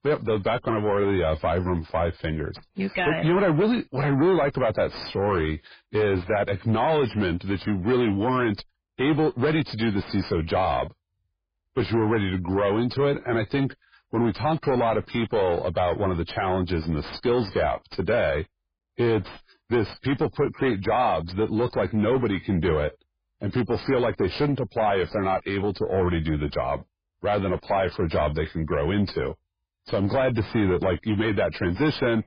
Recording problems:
distortion; heavy; 6 dB below the speech
garbled, watery; badly; nothing above 5 kHz

